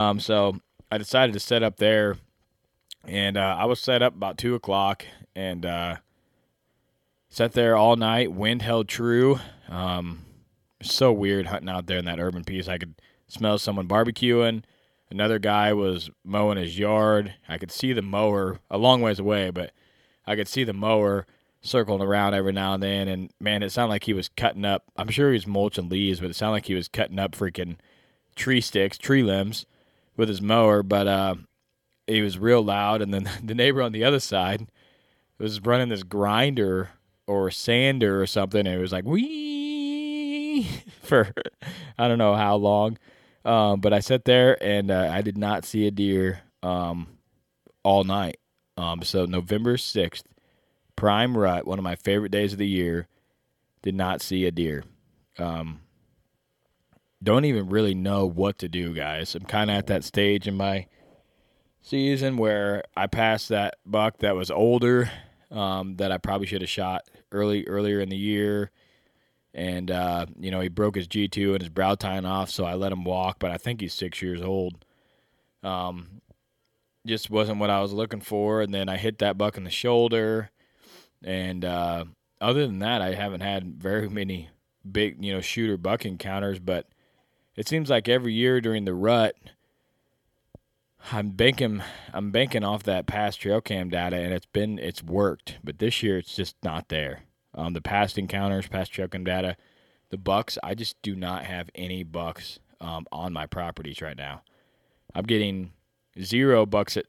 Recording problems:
abrupt cut into speech; at the start

